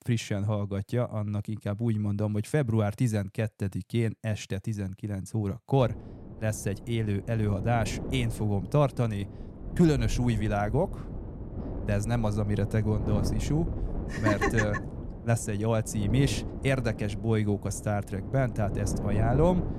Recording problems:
wind noise on the microphone; occasional gusts; from 6 s on; 10 dB below the speech

